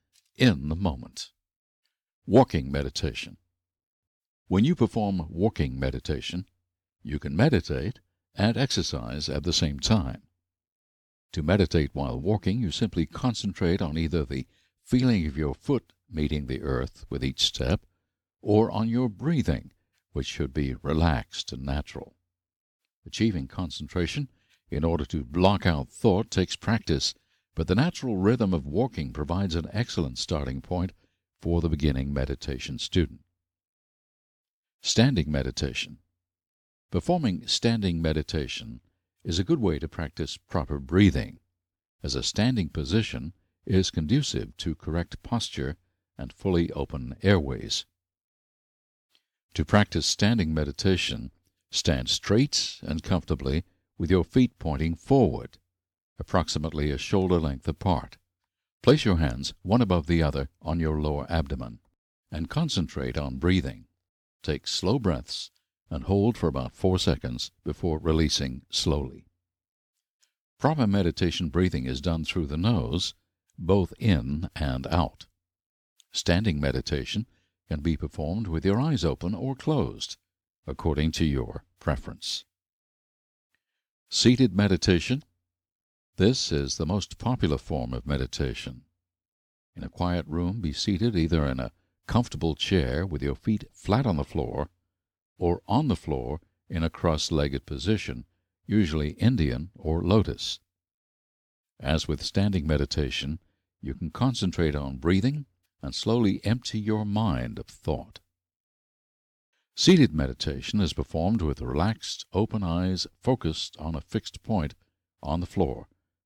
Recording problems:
none

